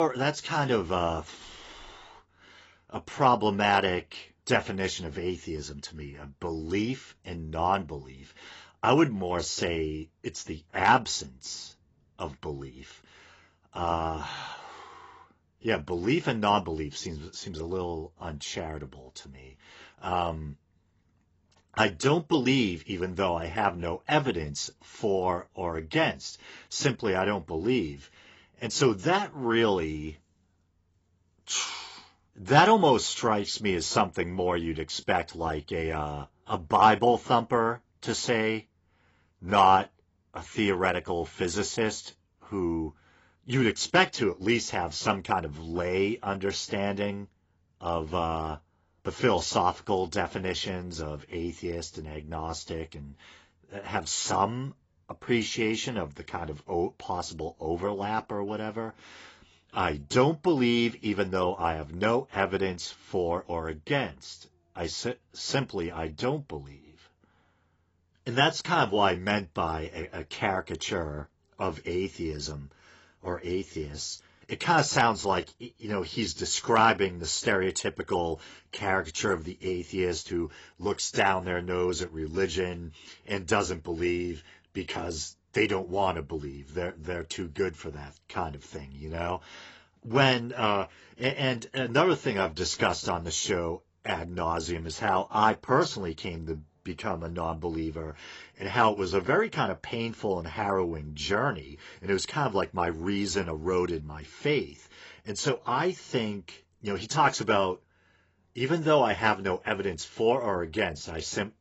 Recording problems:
garbled, watery; badly; nothing above 7.5 kHz
abrupt cut into speech; at the start

